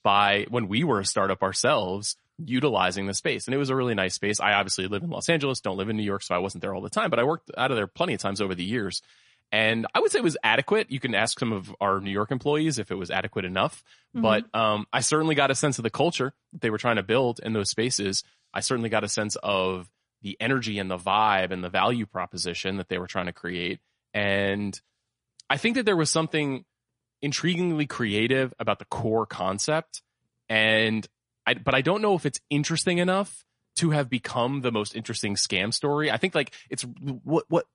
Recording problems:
garbled, watery; slightly; nothing above 10.5 kHz

